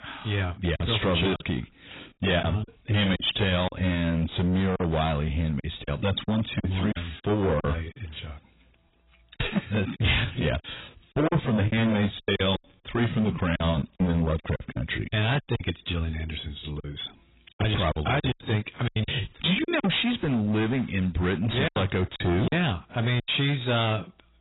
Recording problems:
distortion; heavy; 18% of the sound clipped
garbled, watery; badly; nothing above 4 kHz
choppy; very; 9% of the speech affected

